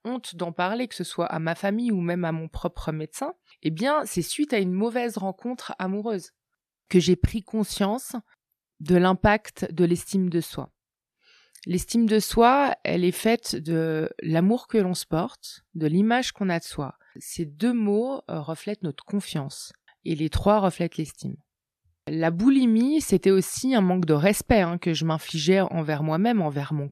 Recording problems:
none

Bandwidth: 13.5 kHz